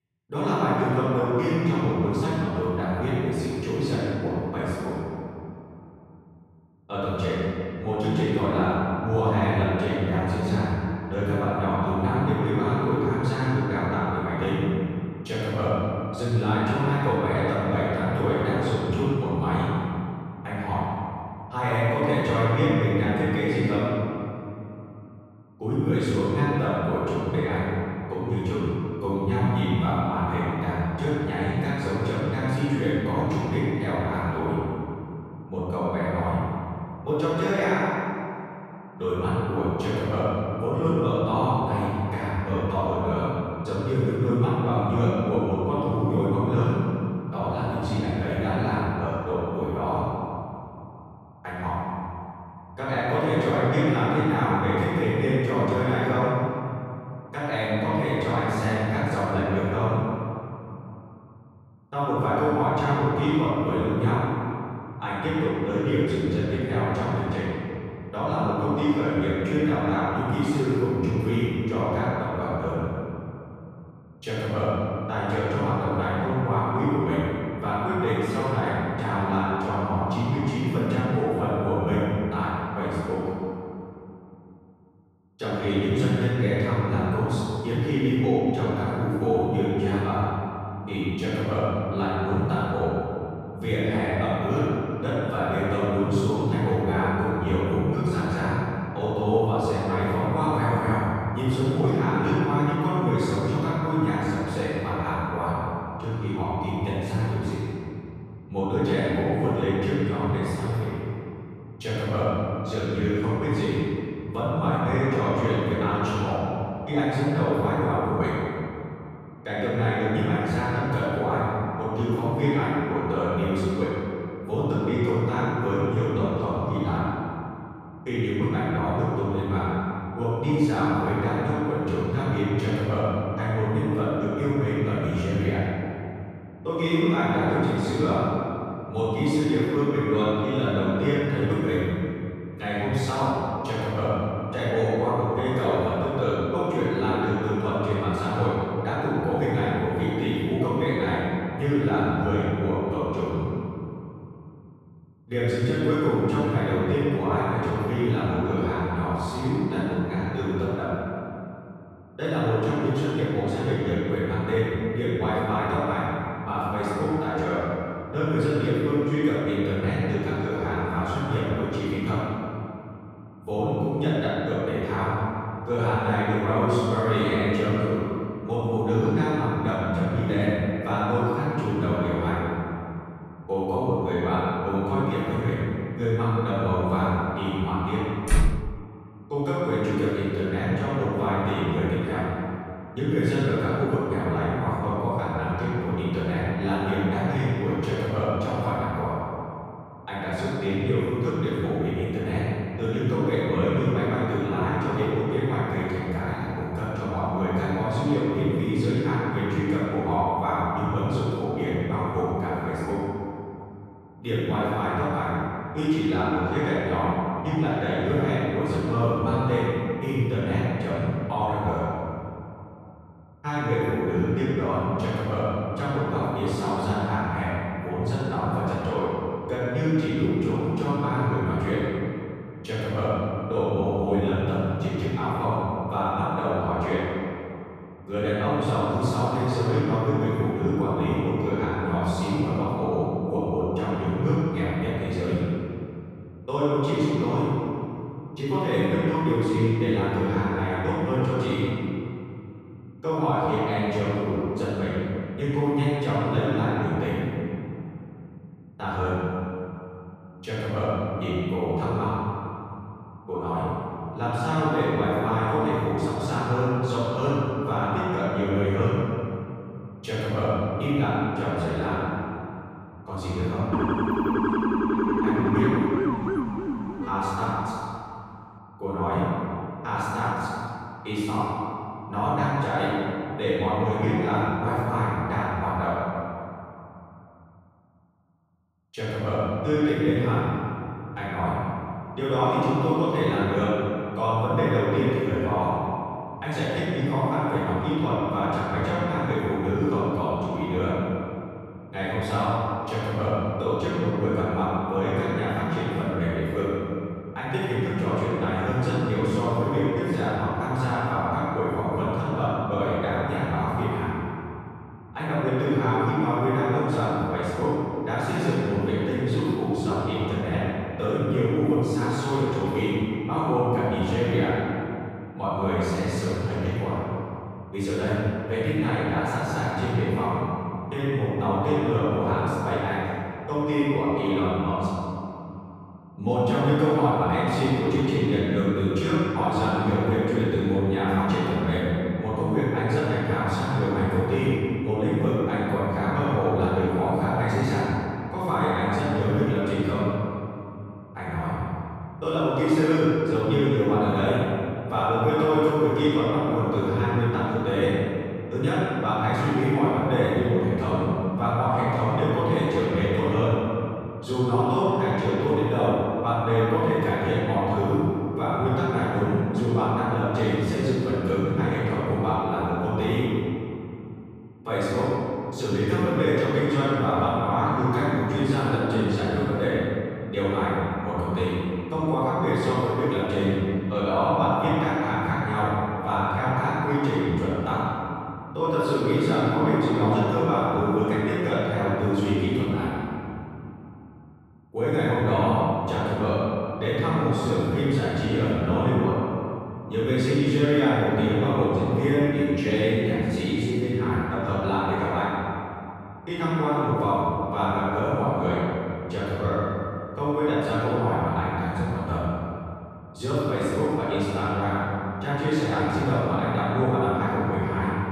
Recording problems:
room echo; strong; dies away in 2.6 s
off-mic speech; far
door banging; loud; at 3:08; peak 1 dB above the speech
siren; loud; from 4:34 to 4:38; peak 2 dB above the speech

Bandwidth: 15 kHz